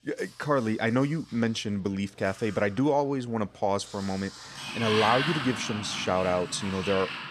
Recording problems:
household noises; loud; throughout; 5 dB below the speech

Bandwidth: 14.5 kHz